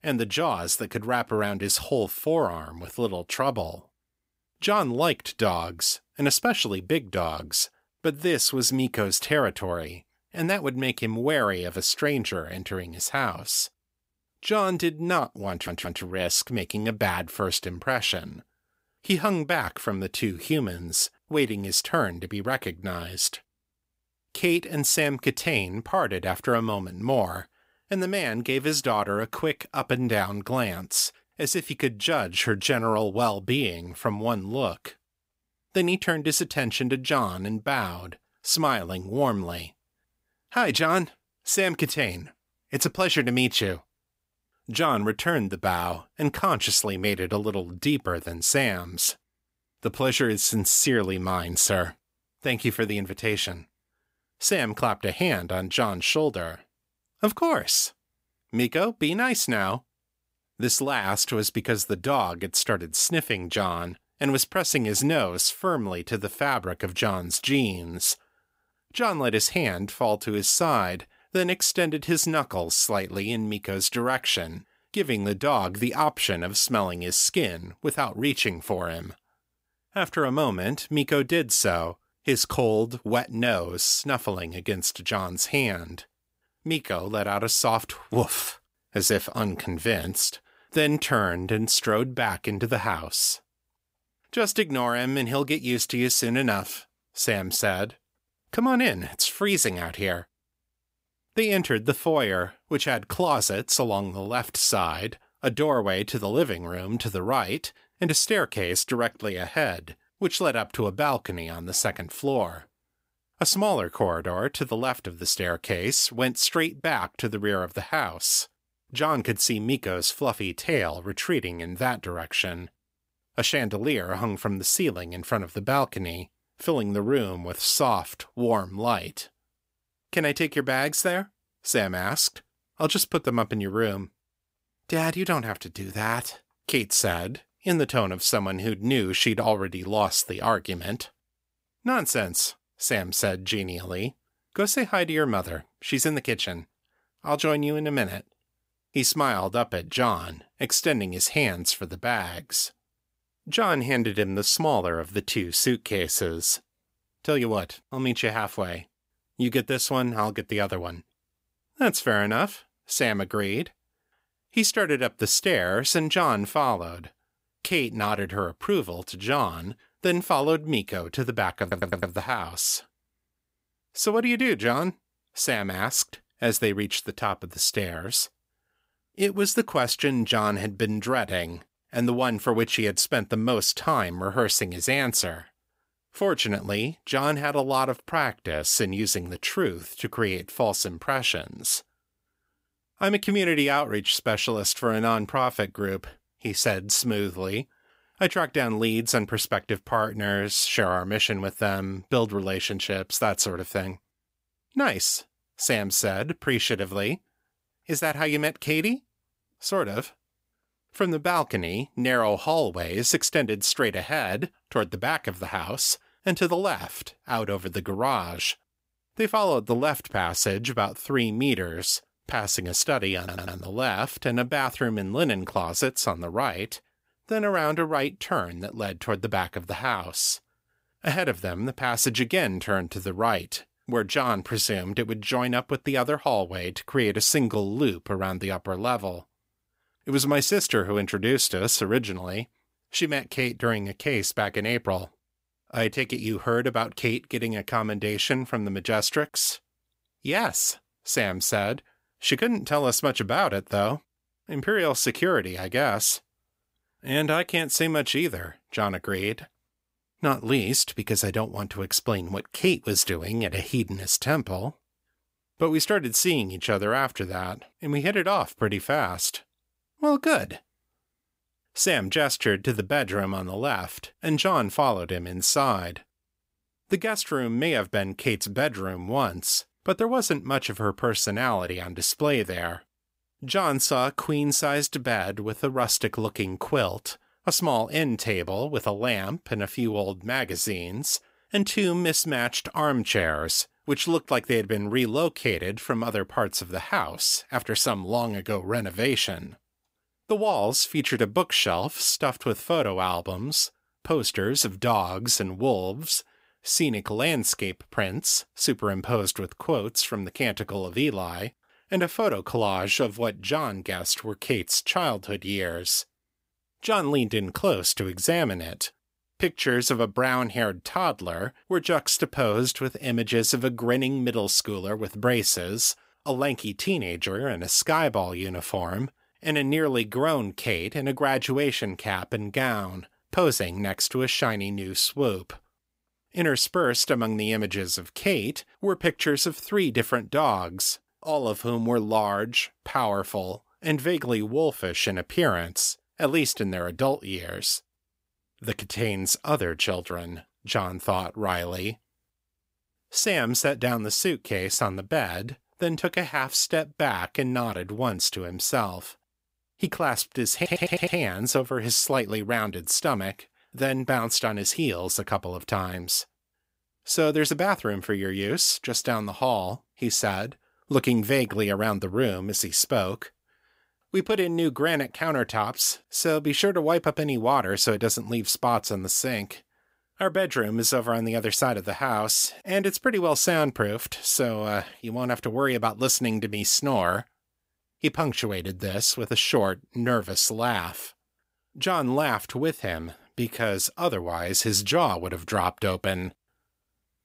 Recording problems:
audio stuttering; 4 times, first at 16 s

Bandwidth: 15.5 kHz